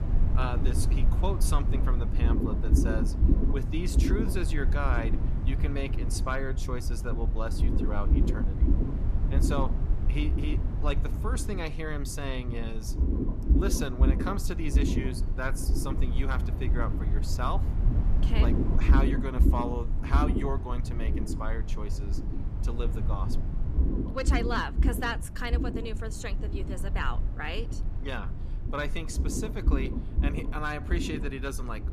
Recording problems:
low rumble; loud; throughout; 5 dB below the speech

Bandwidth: 14.5 kHz